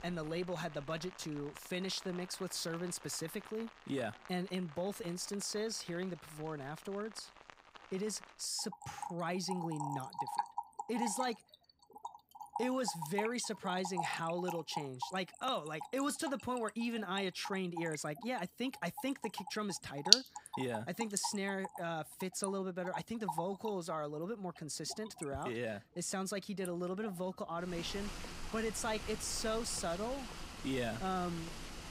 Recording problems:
rain or running water; loud; throughout; 1 dB below the speech

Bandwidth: 15.5 kHz